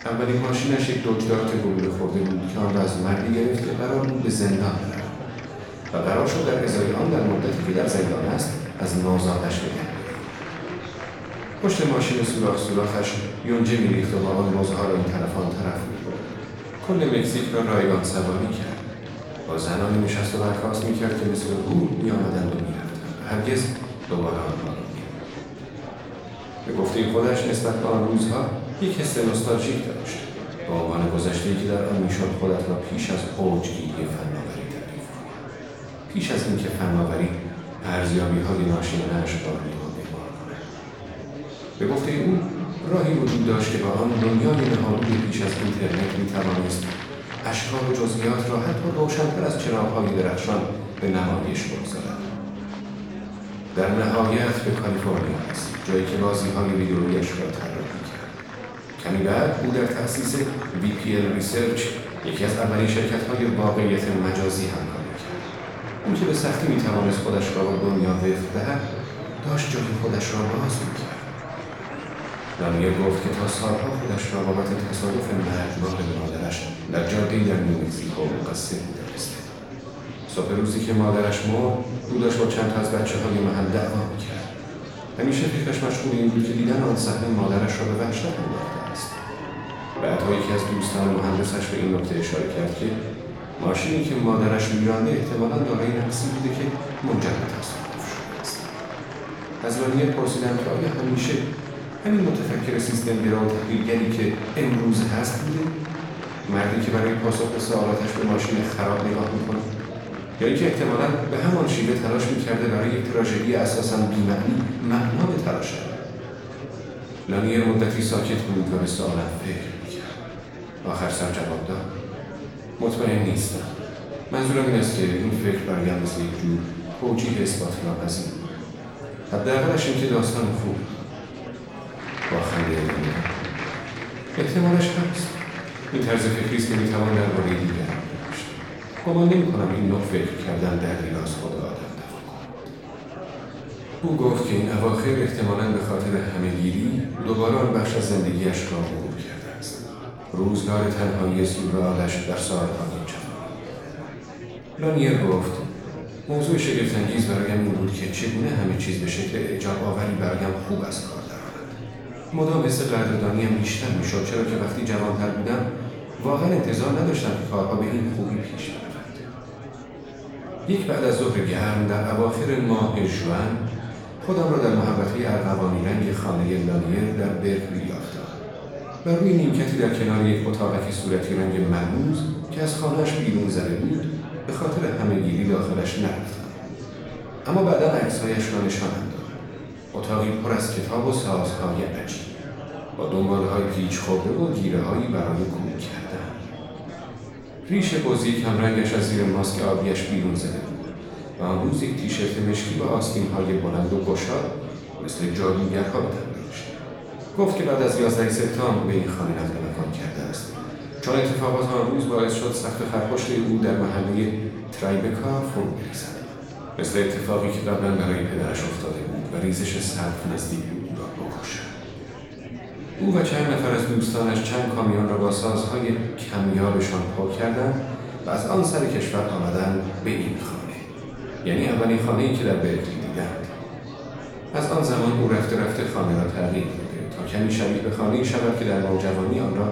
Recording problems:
off-mic speech; far
room echo; noticeable; dies away in 0.9 s
murmuring crowd; noticeable; throughout; 10 dB below the speech
background music; faint; throughout; 25 dB below the speech

